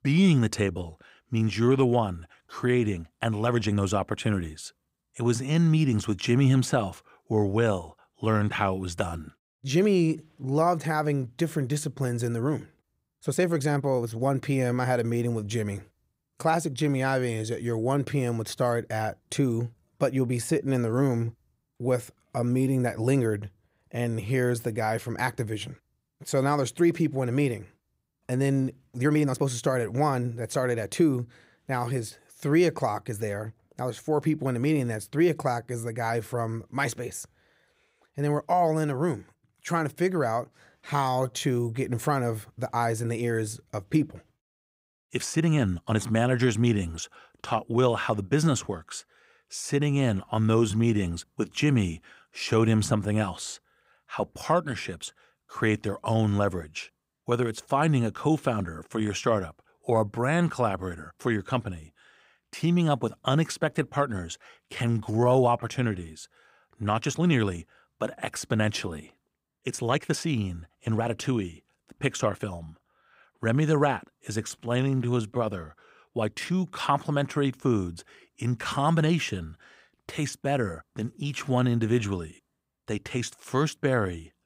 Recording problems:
uneven, jittery; strongly; from 3 s to 1:17

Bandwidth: 15.5 kHz